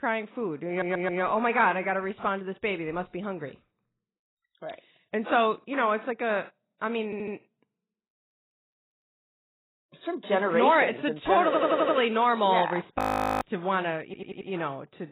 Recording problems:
garbled, watery; badly; nothing above 15.5 kHz
audio stuttering; 4 times, first at 0.5 s
audio freezing; at 13 s

